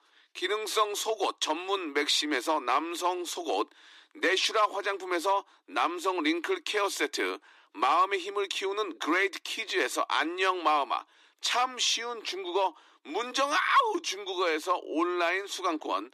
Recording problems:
thin; very; fading below 300 Hz

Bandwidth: 14 kHz